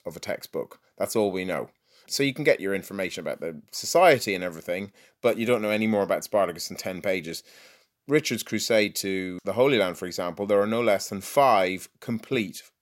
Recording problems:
none

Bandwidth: 16 kHz